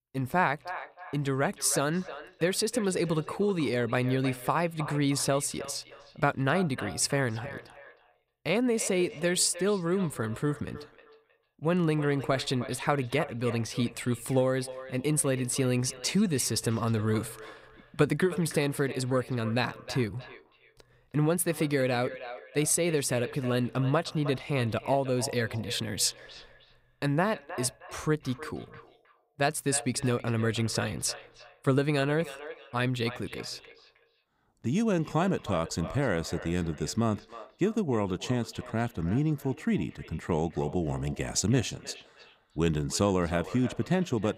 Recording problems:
echo of what is said; noticeable; throughout; 310 ms later, 15 dB below the speech

